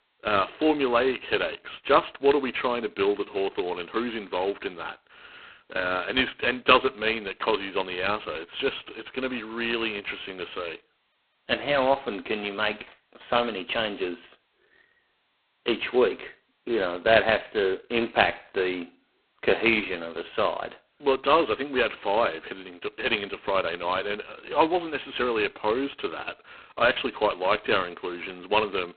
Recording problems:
phone-call audio; poor line; nothing above 4 kHz

